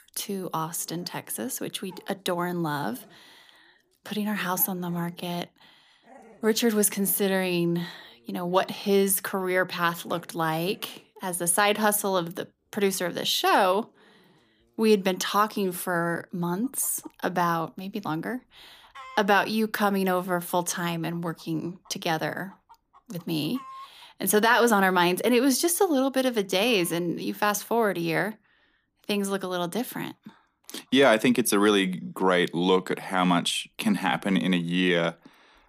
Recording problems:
animal sounds; faint; throughout; 30 dB below the speech

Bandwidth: 15 kHz